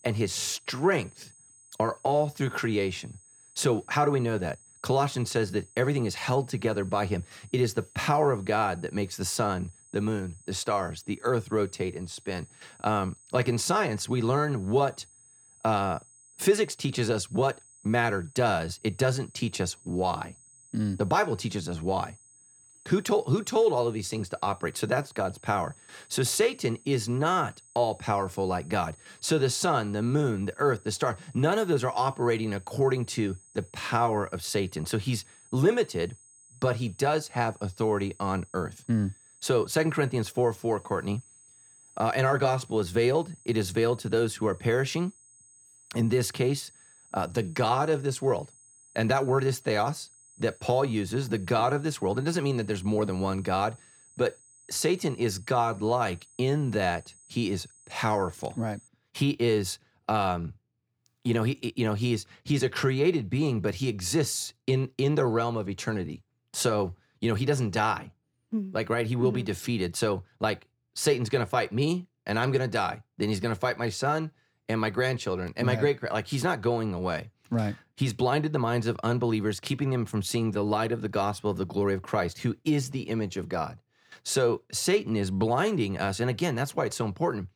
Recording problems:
high-pitched whine; faint; until 59 s; 8 kHz, 25 dB below the speech

